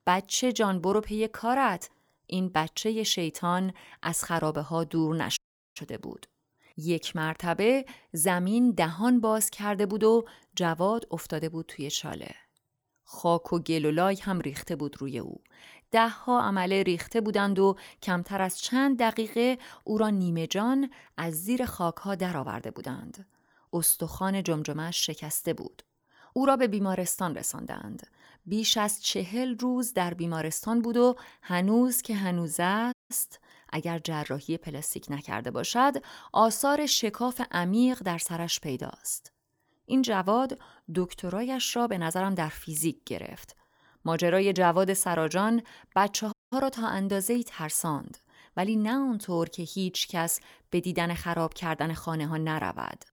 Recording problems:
audio cutting out; at 5.5 s, at 33 s and at 46 s

